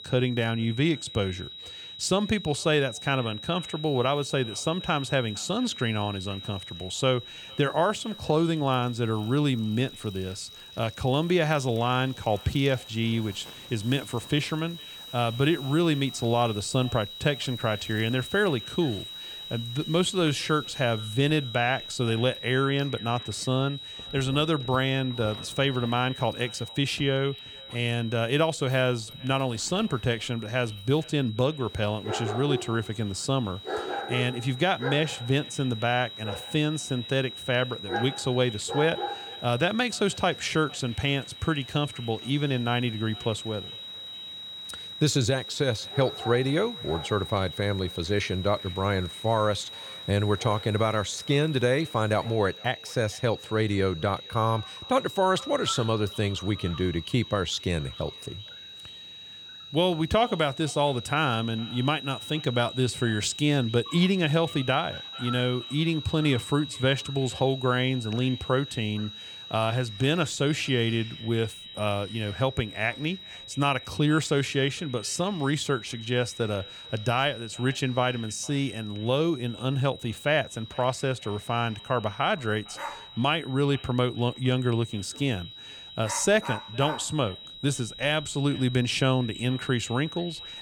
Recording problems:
echo of what is said; faint; throughout; 460 ms later, 25 dB below the speech
high-pitched whine; noticeable; throughout; 4 kHz, 10 dB below the speech
animal sounds; noticeable; throughout; 15 dB below the speech

